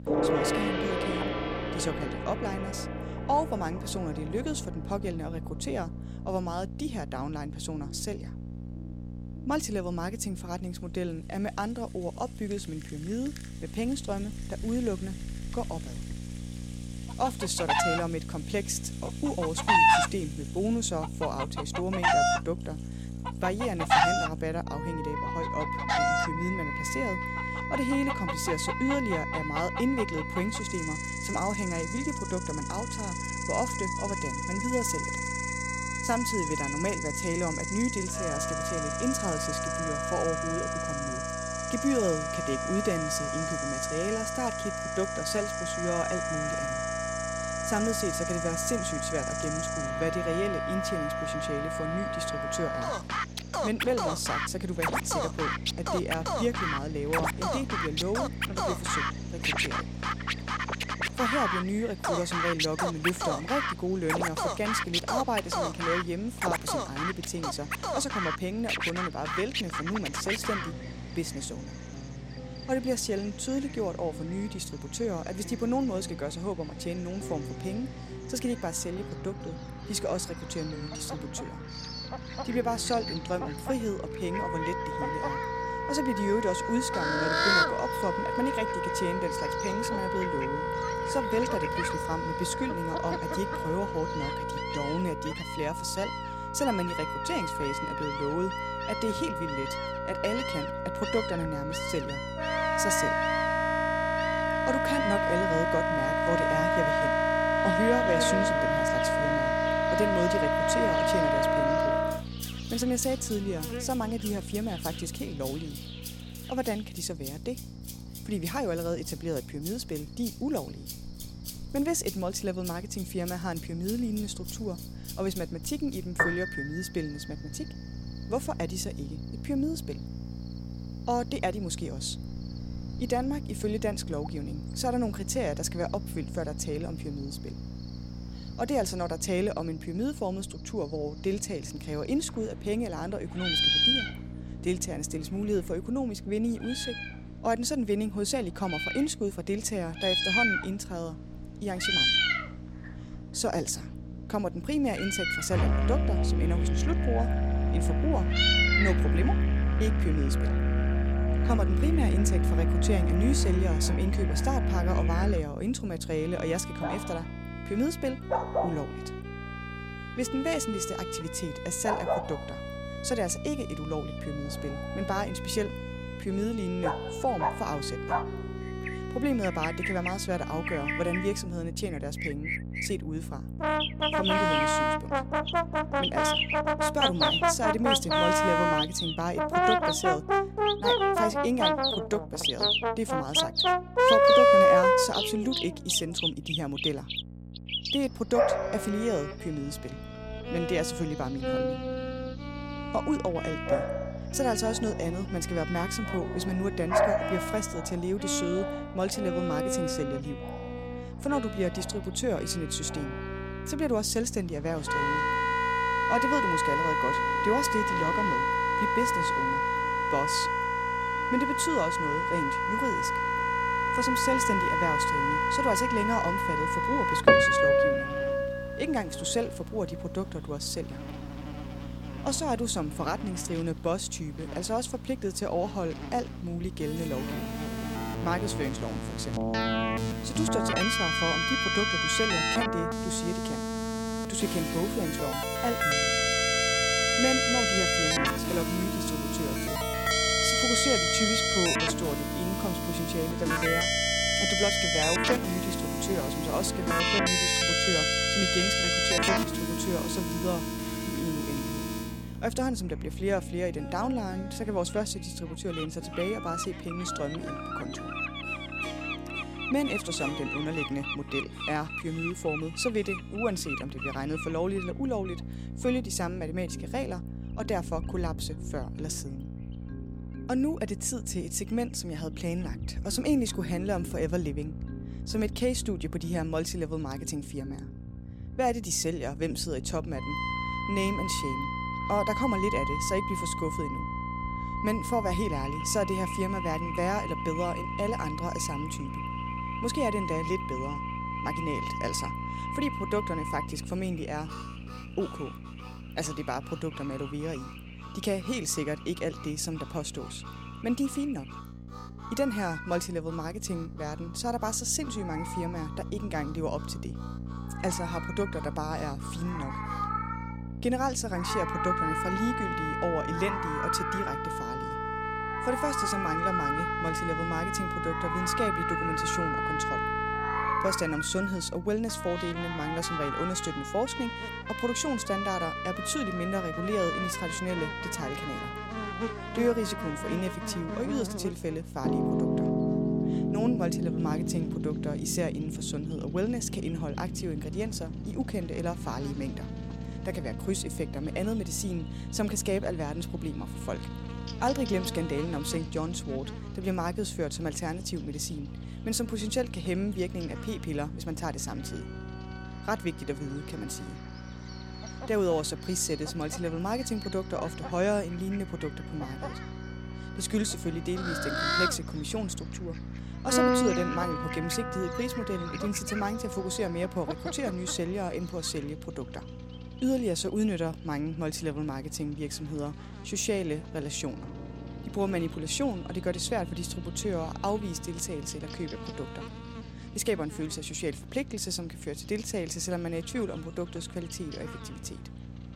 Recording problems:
background music; very loud; throughout; 3 dB above the speech
animal sounds; loud; throughout; 2 dB below the speech
electrical hum; noticeable; throughout; 60 Hz, 15 dB below the speech

